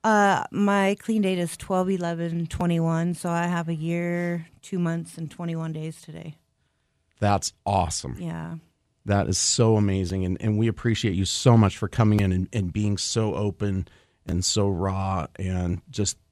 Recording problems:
none

